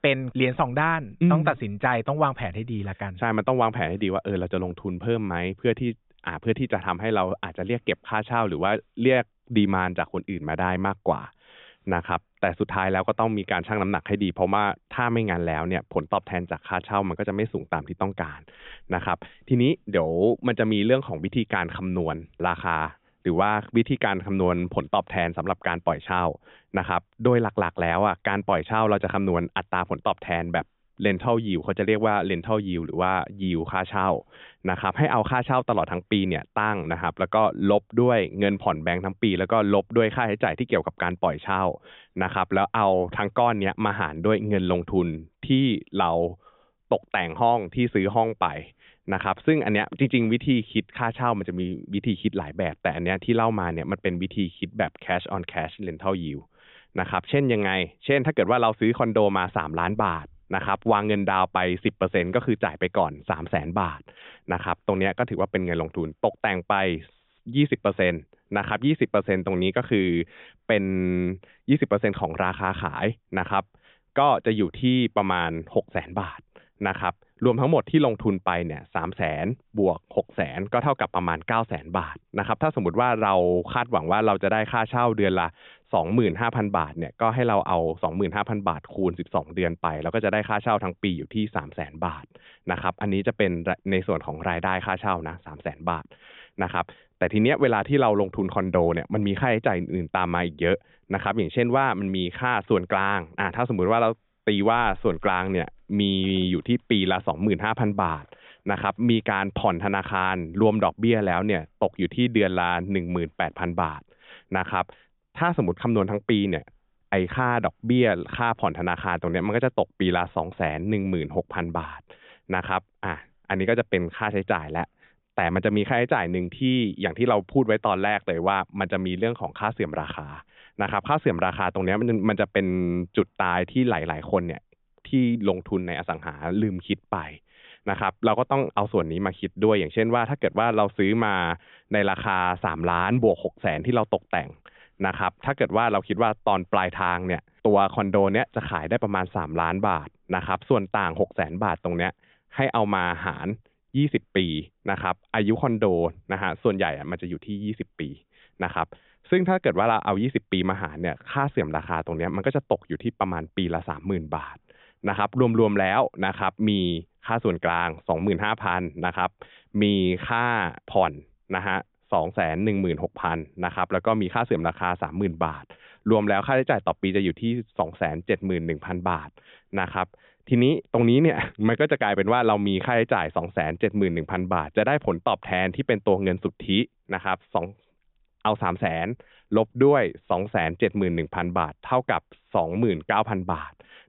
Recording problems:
high frequencies cut off; severe; nothing above 3.5 kHz

